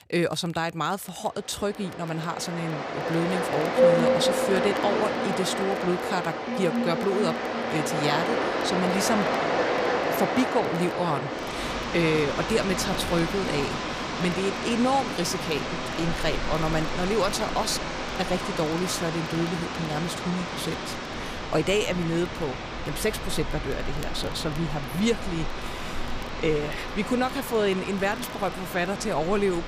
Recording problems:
rain or running water; loud; throughout; 1 dB below the speech
crackle, like an old record; faint; 25 dB below the speech

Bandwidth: 15 kHz